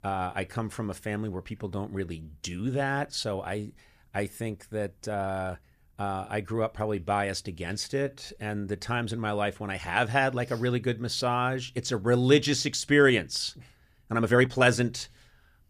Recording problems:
uneven, jittery; strongly; from 1.5 to 15 s

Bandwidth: 14.5 kHz